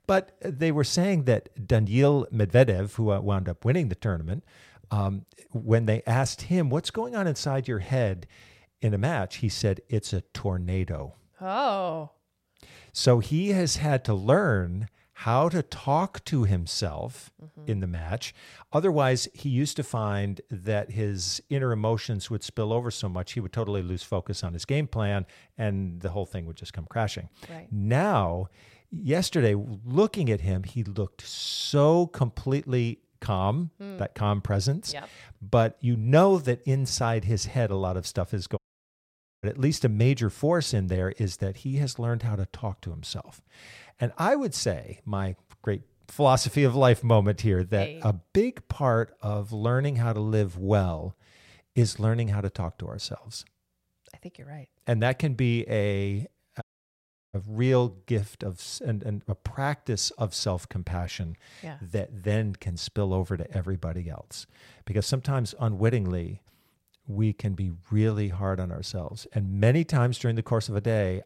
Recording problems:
audio cutting out; at 39 s for 1 s and at 57 s for 0.5 s

